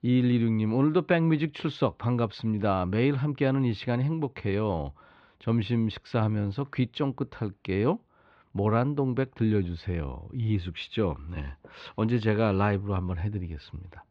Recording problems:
muffled; slightly; fading above 3.5 kHz

